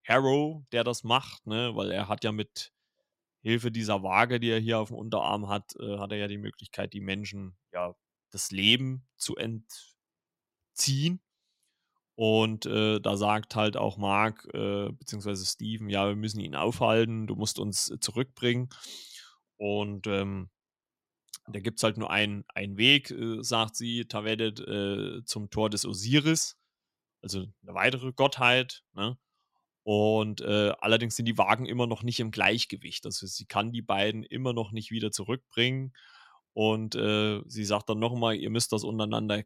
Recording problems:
none

